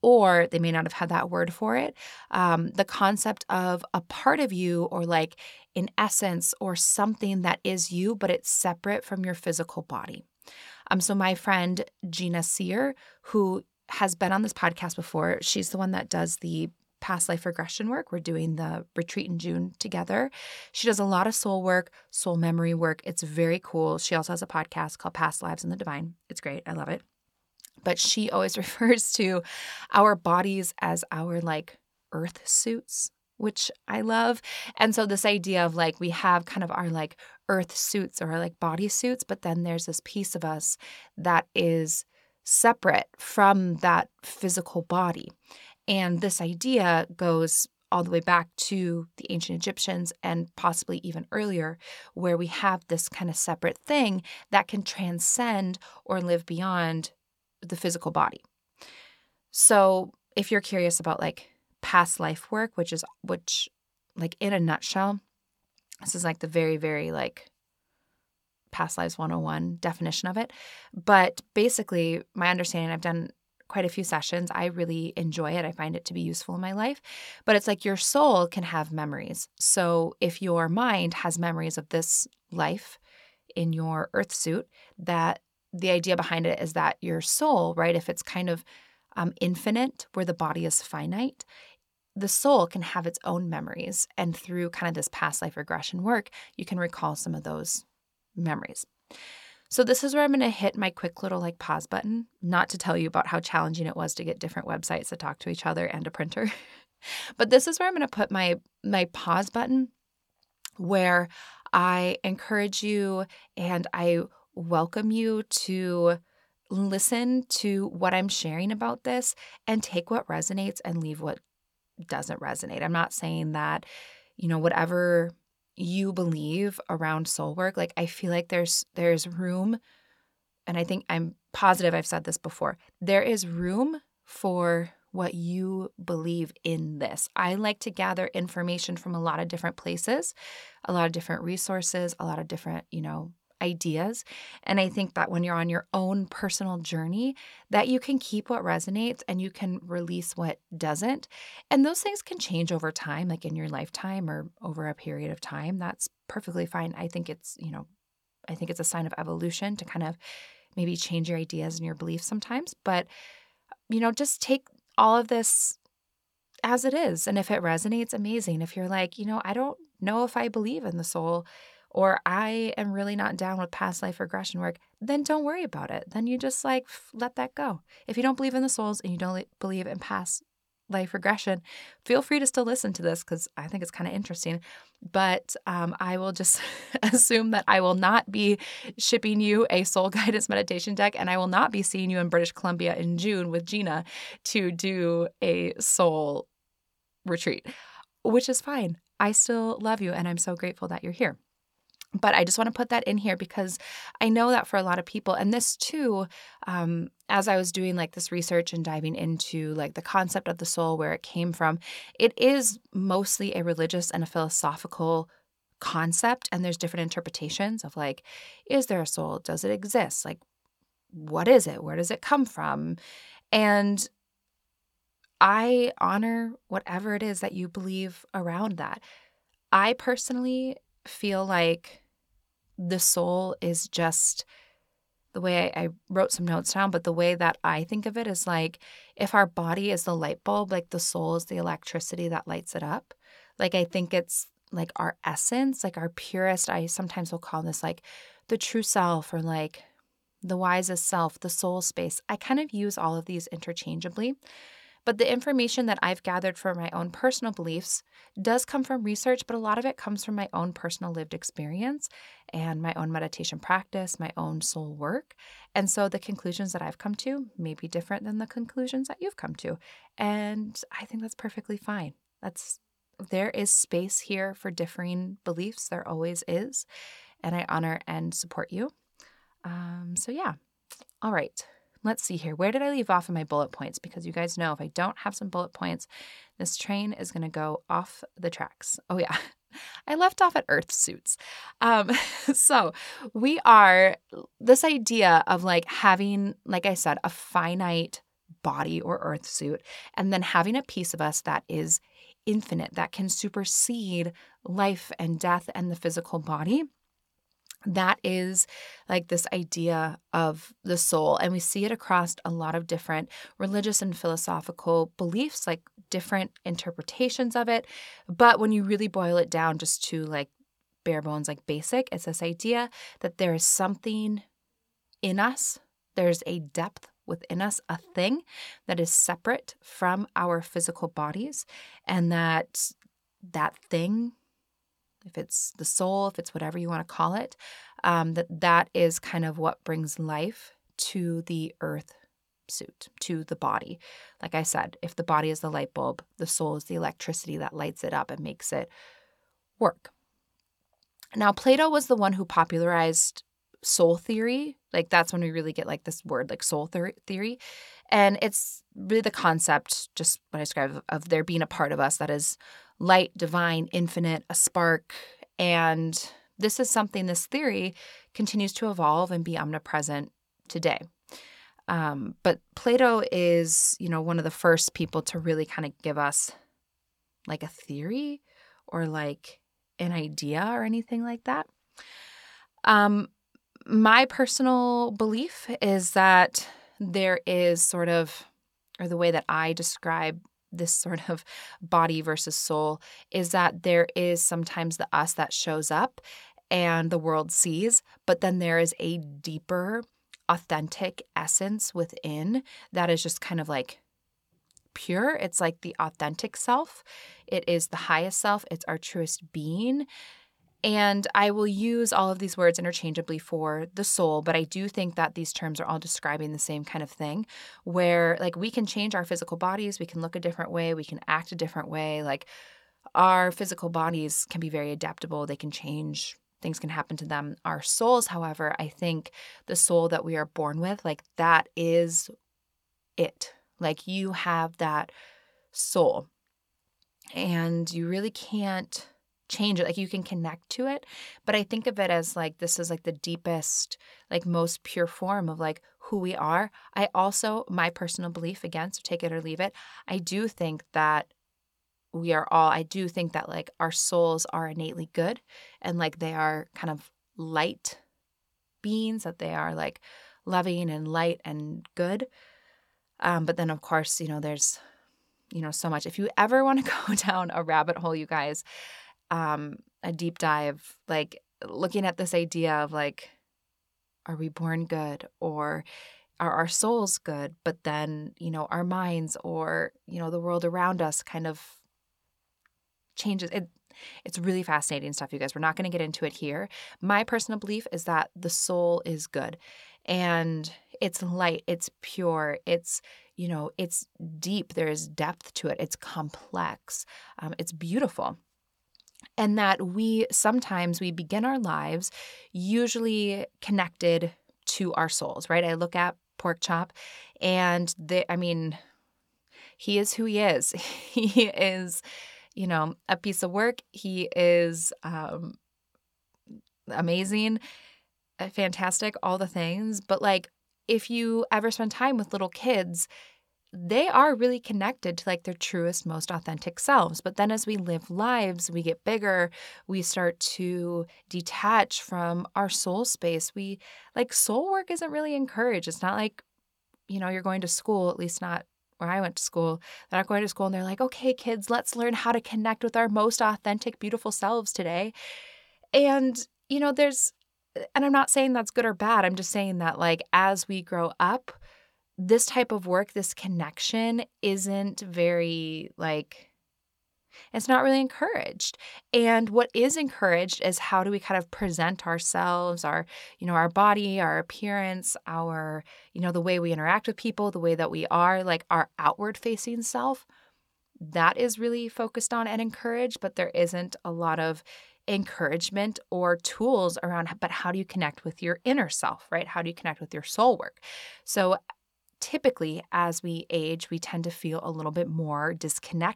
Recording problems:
none

